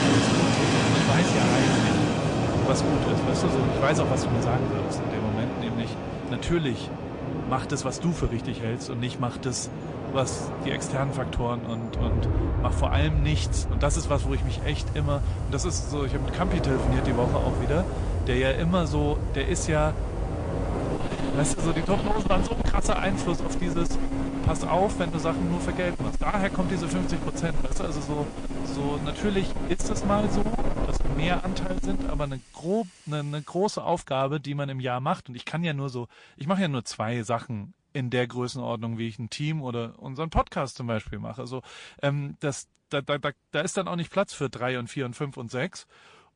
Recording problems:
distortion; slight; 10 dB below the speech
garbled, watery; slightly; nothing above 8.5 kHz
train or aircraft noise; very loud; until 32 s; 1 dB above the speech
hiss; faint; from 14 to 34 s; 25 dB below the speech

